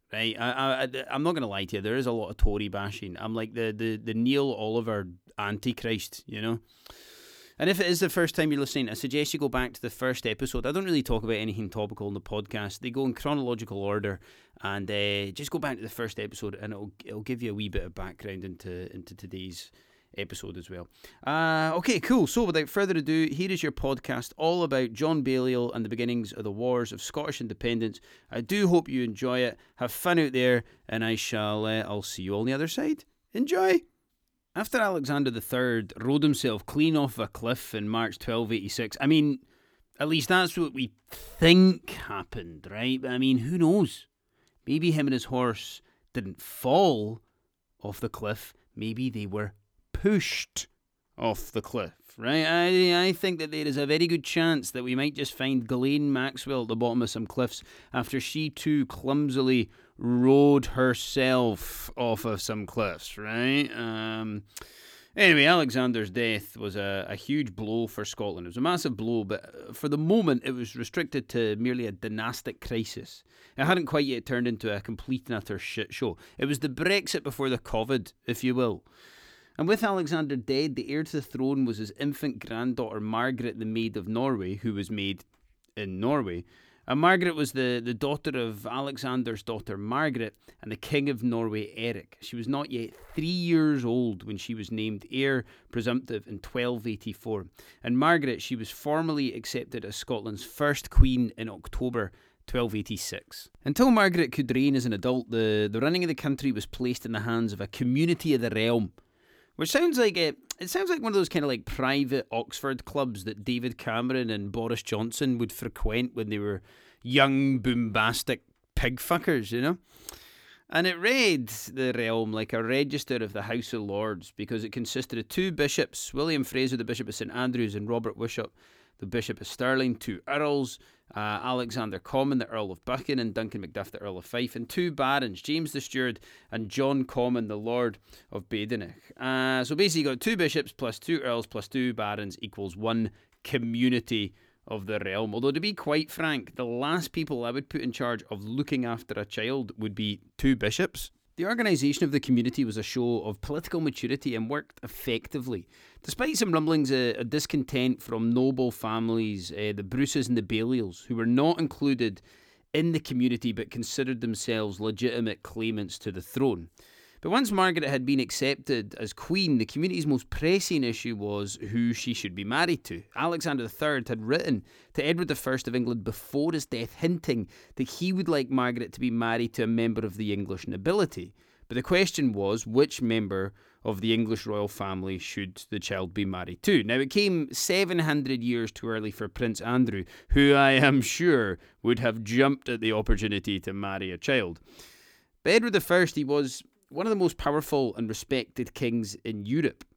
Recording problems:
none

